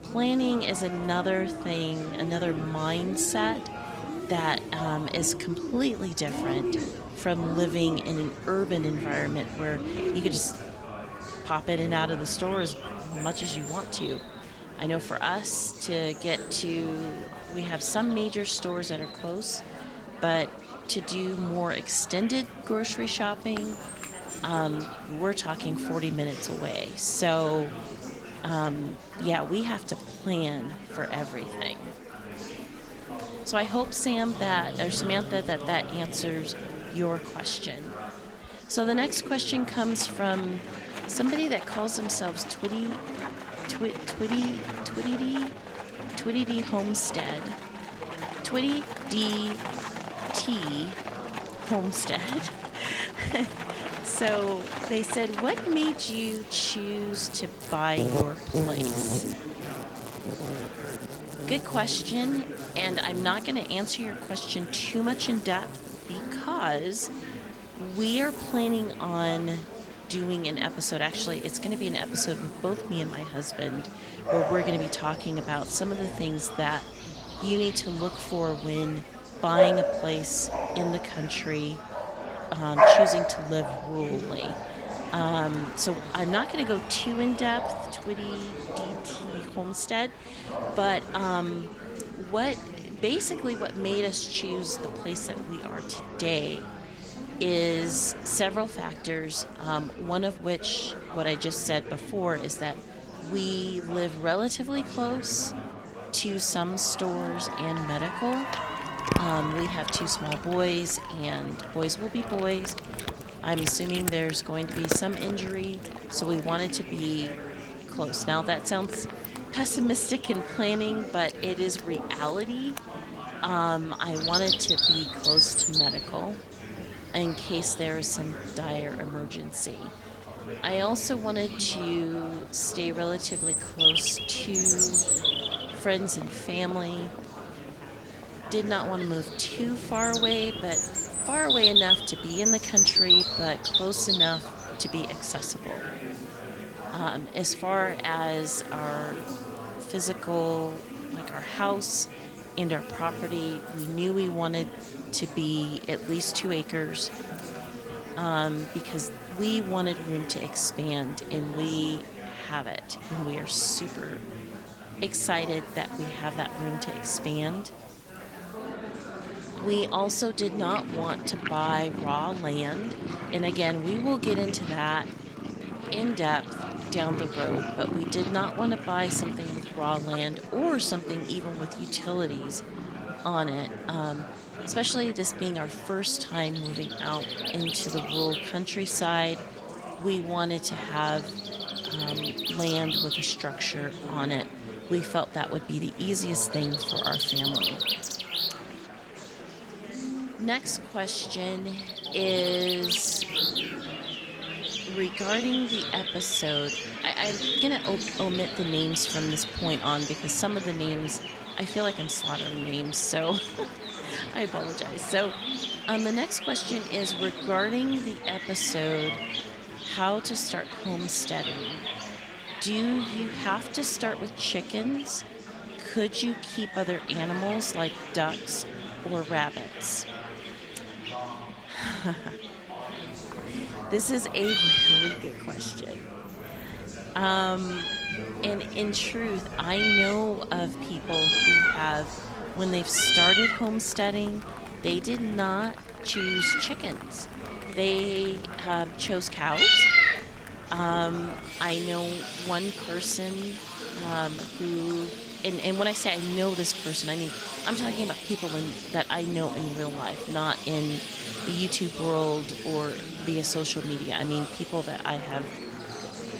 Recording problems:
garbled, watery; slightly; nothing above 15.5 kHz
animal sounds; very loud; throughout; 1 dB above the speech
chatter from many people; loud; throughout; 9 dB below the speech

